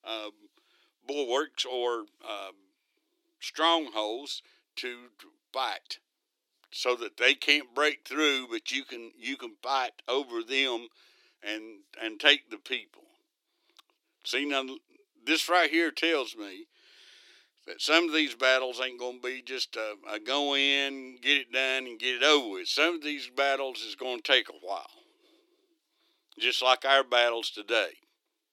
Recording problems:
thin; somewhat; fading below 300 Hz

